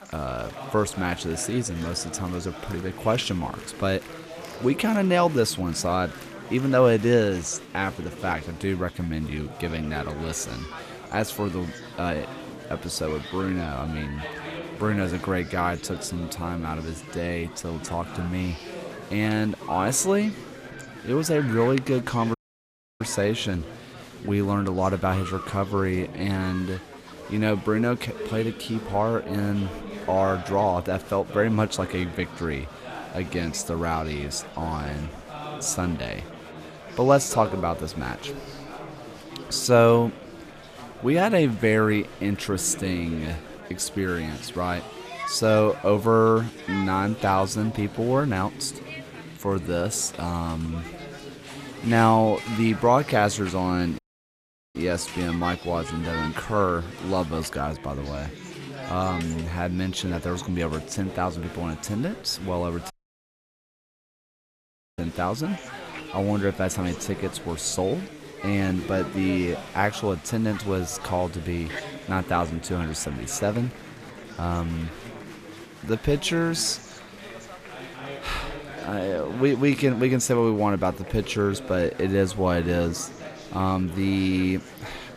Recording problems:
chatter from many people; noticeable; throughout; 15 dB below the speech
audio cutting out; at 22 s for 0.5 s, at 54 s for 1 s and at 1:03 for 2 s

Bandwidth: 14.5 kHz